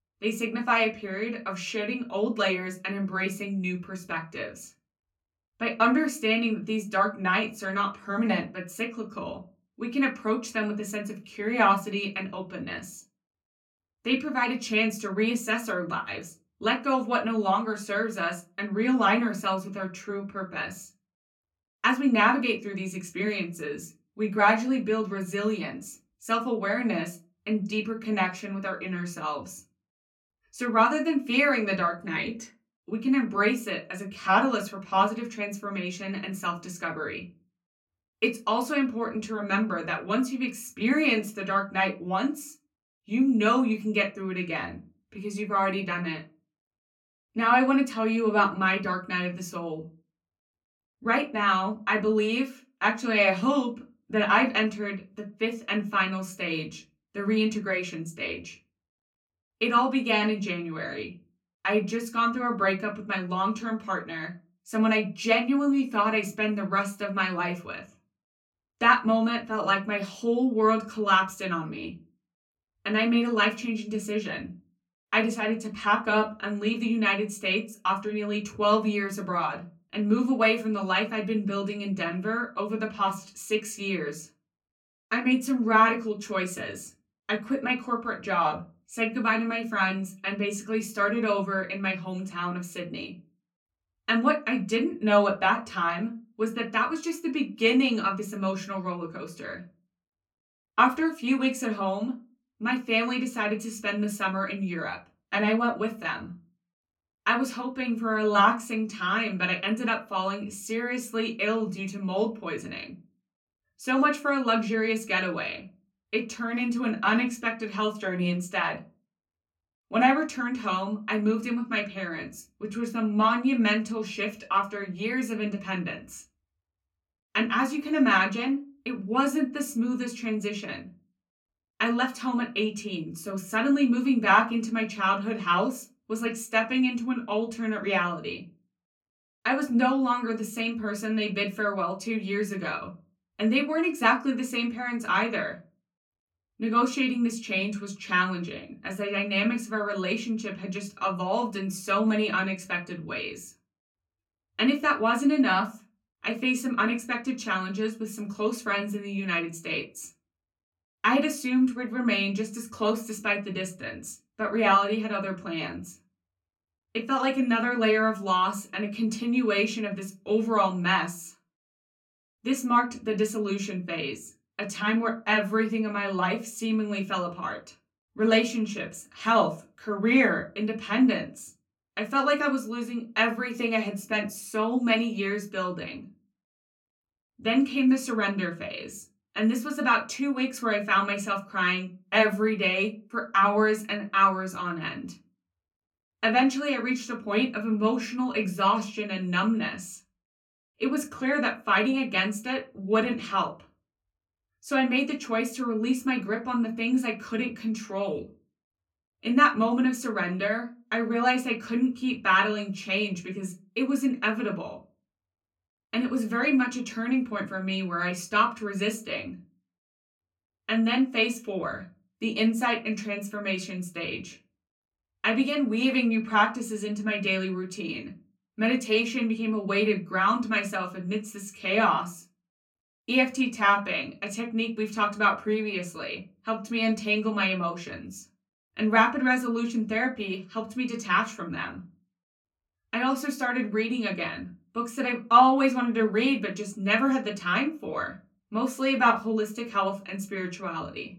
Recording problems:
off-mic speech; far
room echo; very slight; dies away in 0.2 s

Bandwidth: 17 kHz